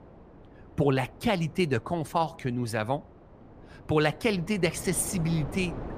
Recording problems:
wind noise on the microphone; occasional gusts; 20 dB below the speech

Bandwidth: 15 kHz